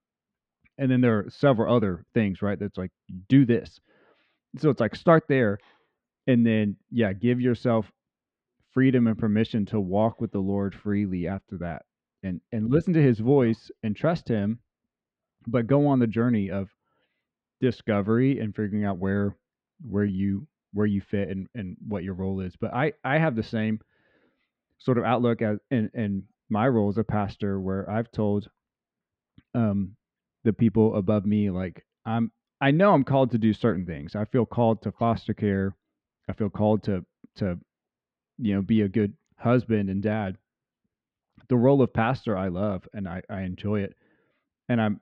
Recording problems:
muffled; slightly; fading above 3 kHz

